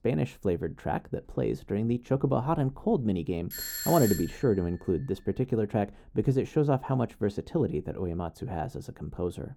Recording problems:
muffled; slightly; fading above 1 kHz
doorbell; noticeable; at 3.5 s; peak 2 dB below the speech

